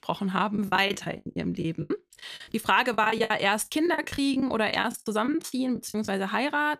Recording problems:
choppy; very; 17% of the speech affected

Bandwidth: 14.5 kHz